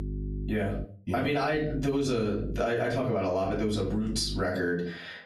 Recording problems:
off-mic speech; far
squashed, flat; heavily
room echo; slight; dies away in 0.4 s
electrical hum; noticeable; at the start, from 1.5 to 2.5 s and from 3.5 to 4.5 s; 50 Hz, 20 dB below the speech

